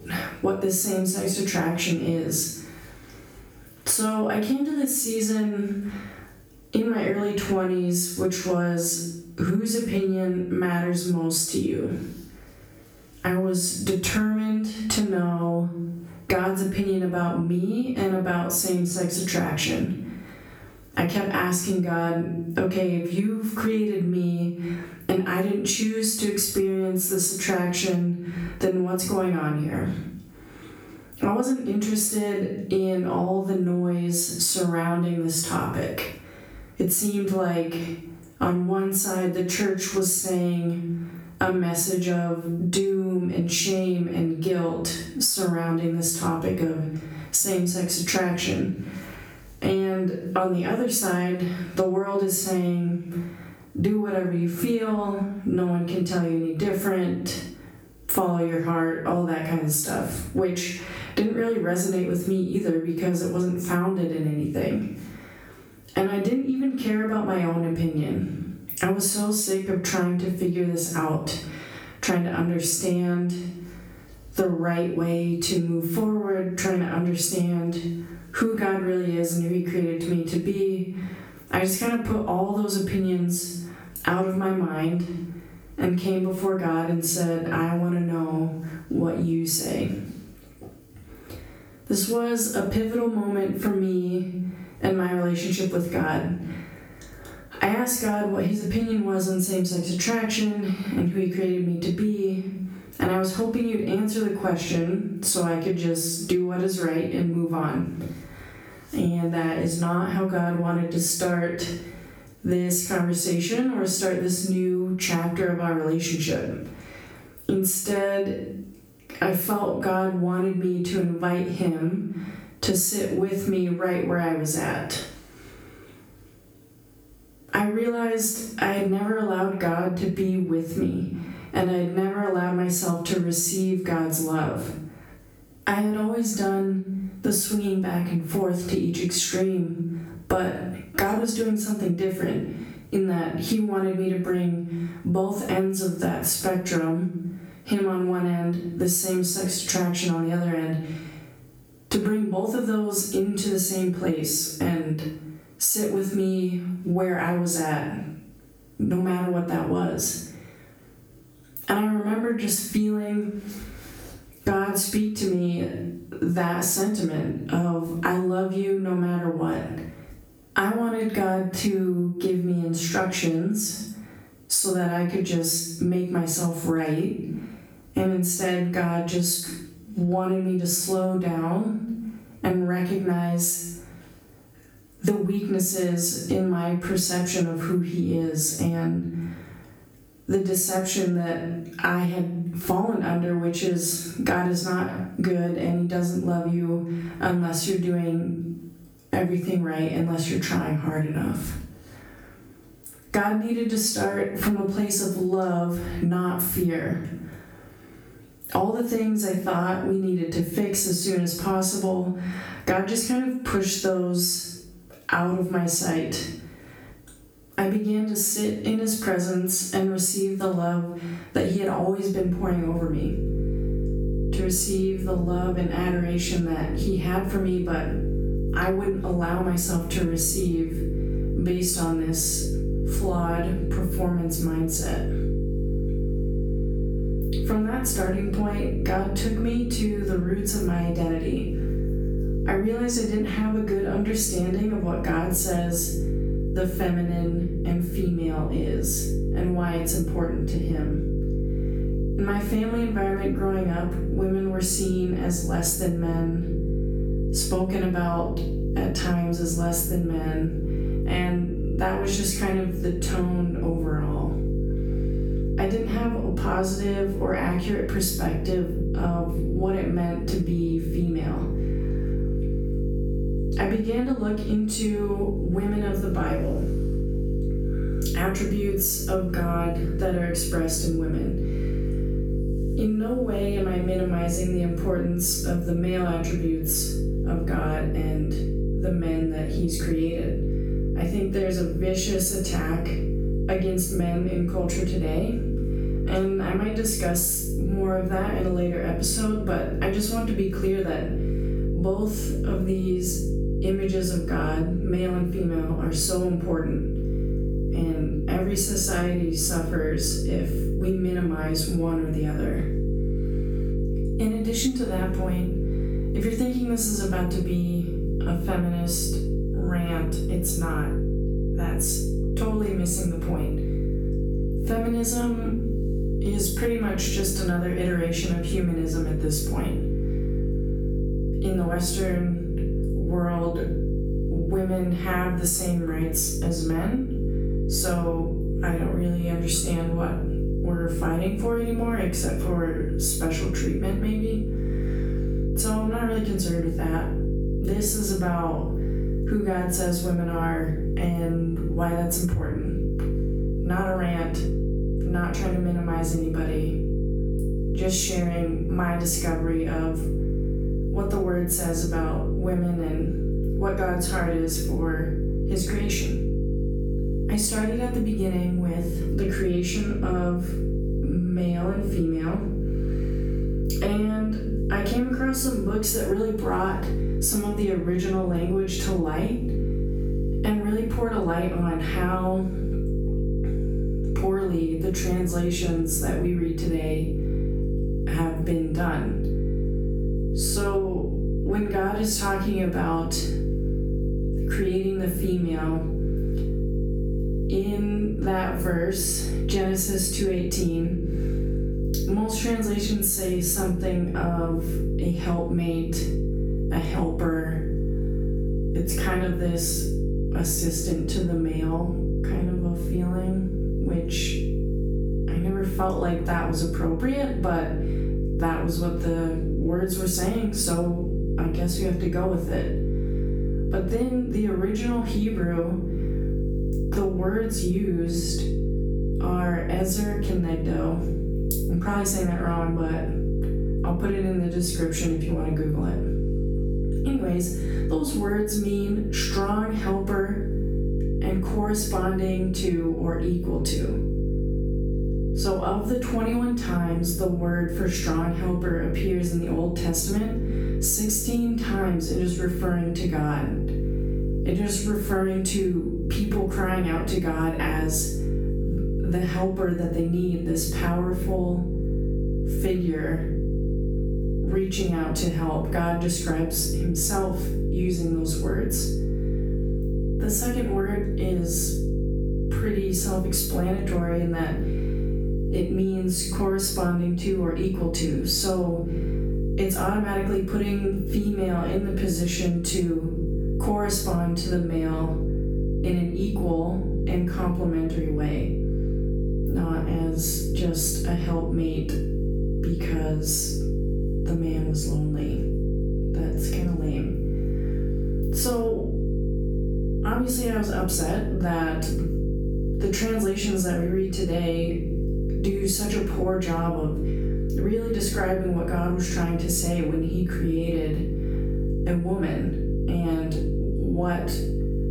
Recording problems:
off-mic speech; far
room echo; noticeable; dies away in 0.5 s
squashed, flat; somewhat
electrical hum; loud; from 3:42 on; 50 Hz, 9 dB below the speech

